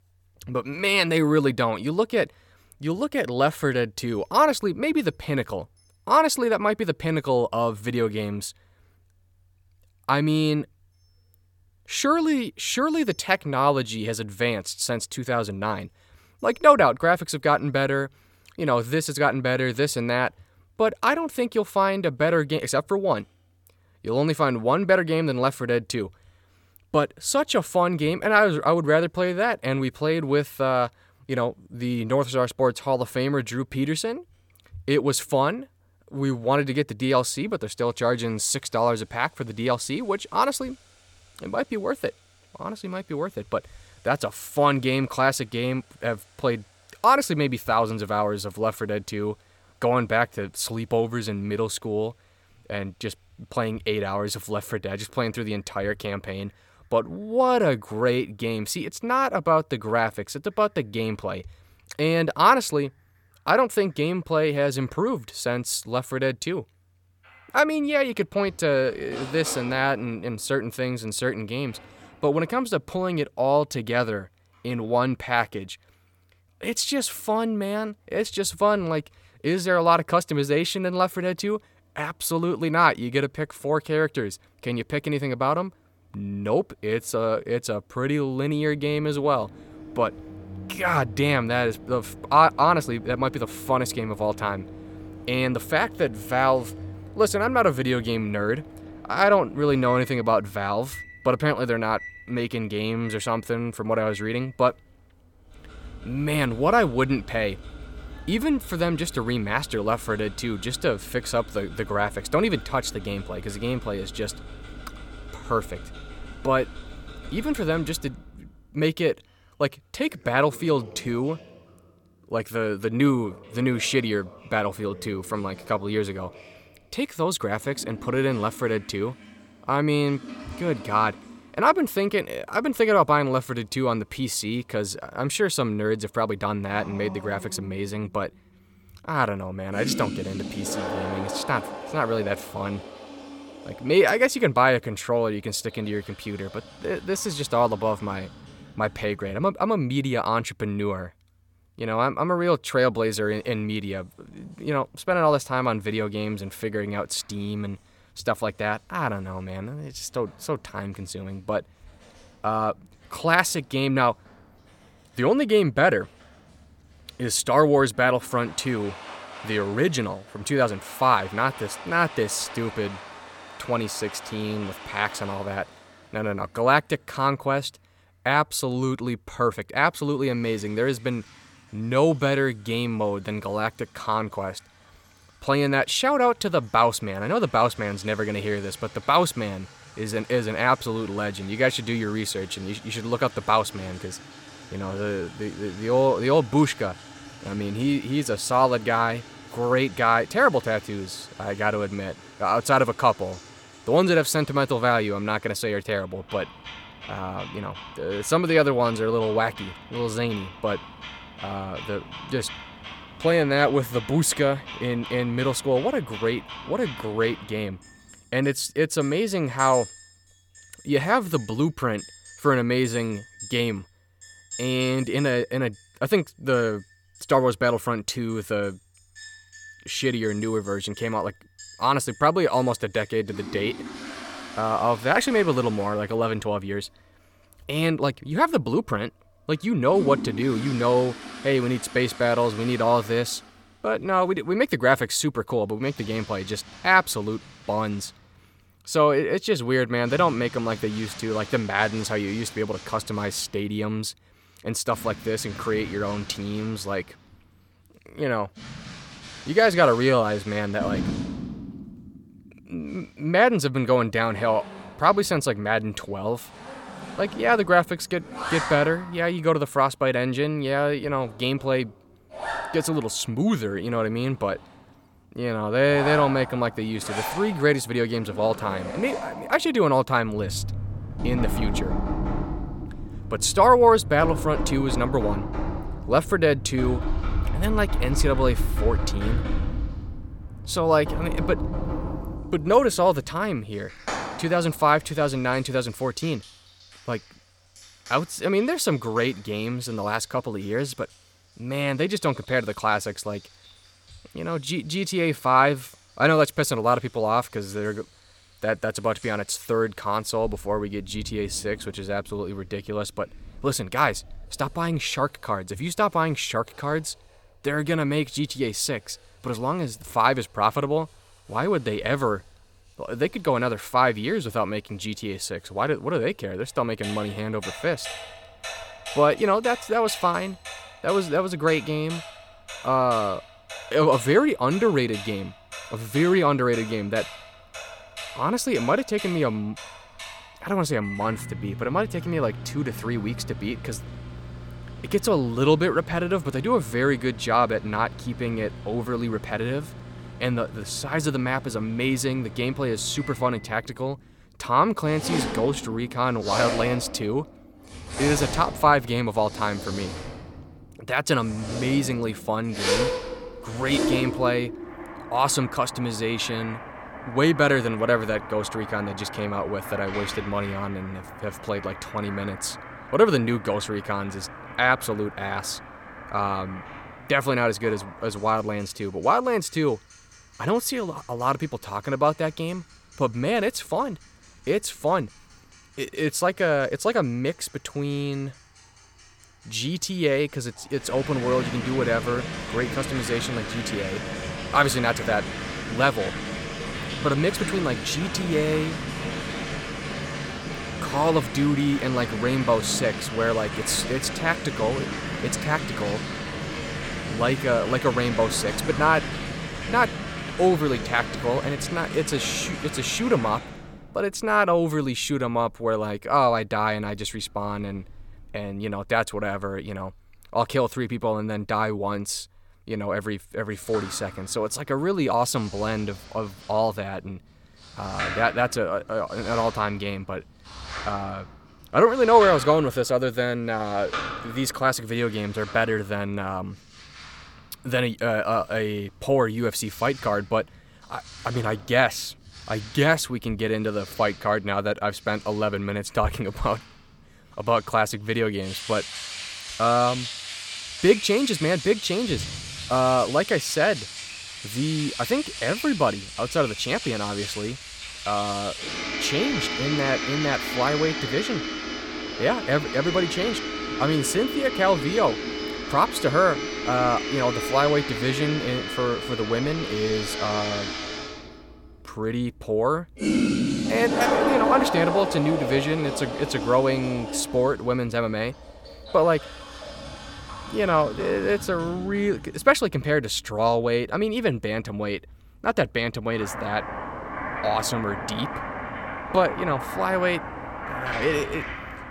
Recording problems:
household noises; loud; throughout; 10 dB below the speech

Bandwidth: 17.5 kHz